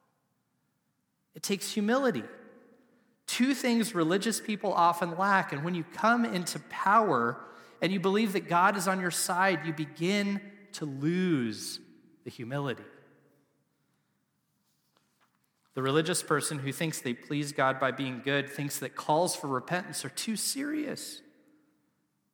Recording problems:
echo of what is said; noticeable; throughout; 100 ms later, 20 dB below the speech

